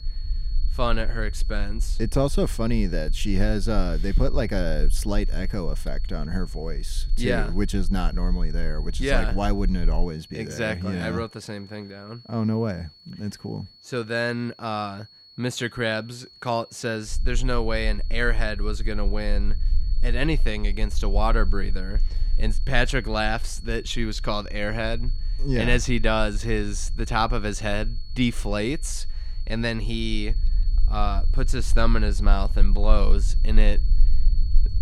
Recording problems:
high-pitched whine; noticeable; throughout; 4.5 kHz, 20 dB below the speech
low rumble; faint; until 10 s and from 17 s on; 25 dB below the speech

